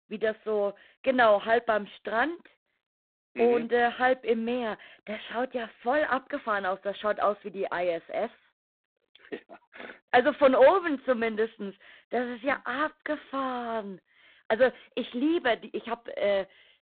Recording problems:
phone-call audio; poor line; nothing above 3.5 kHz

